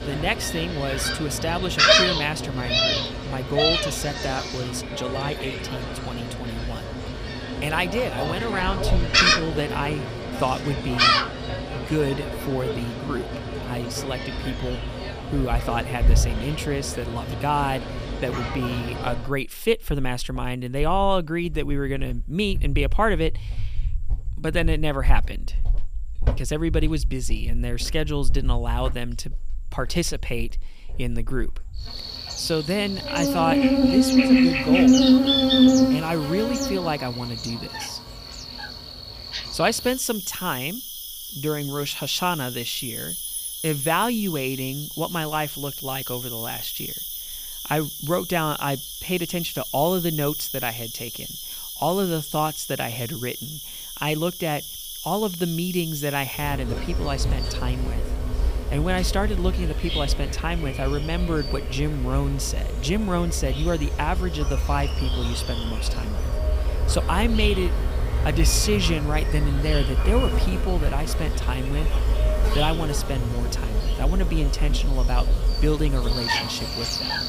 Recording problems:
animal sounds; very loud; throughout; 2 dB above the speech

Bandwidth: 15 kHz